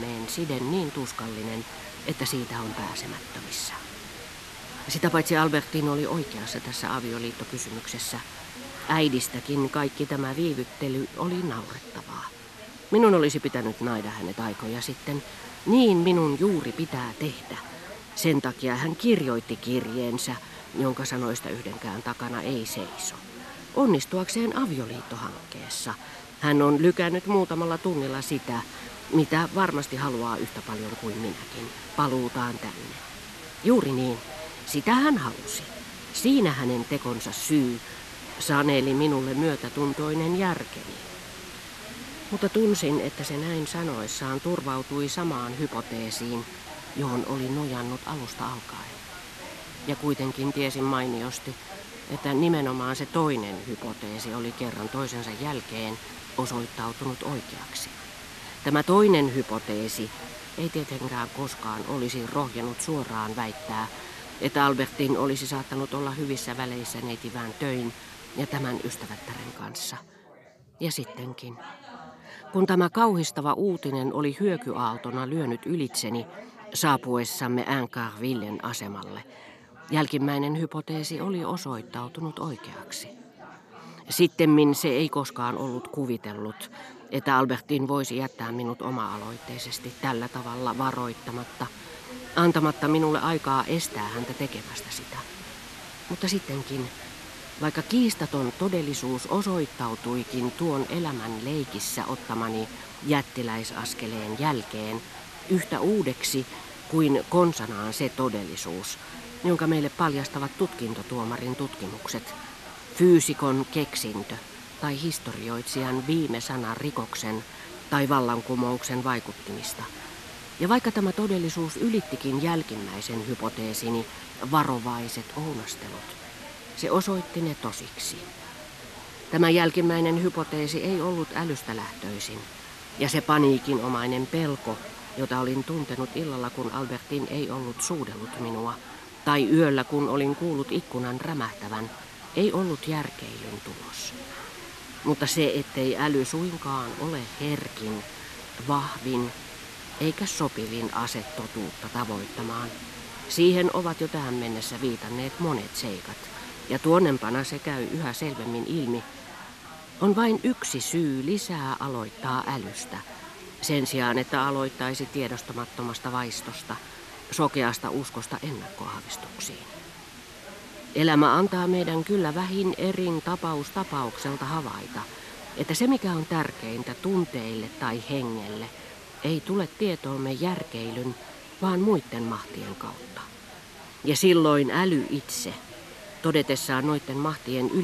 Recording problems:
background chatter; noticeable; throughout; 4 voices, 20 dB below the speech
hiss; noticeable; until 1:10 and from 1:29 on; 15 dB below the speech
abrupt cut into speech; at the start and the end

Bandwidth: 13.5 kHz